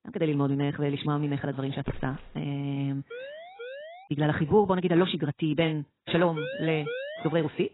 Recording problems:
garbled, watery; badly; nothing above 4 kHz
wrong speed, natural pitch; too fast; 1.5 times normal speed
footsteps; faint; at 2 s; peak 10 dB below the speech
siren; faint; at 3 s; peak 15 dB below the speech
siren; noticeable; at 6.5 s; peak 7 dB below the speech

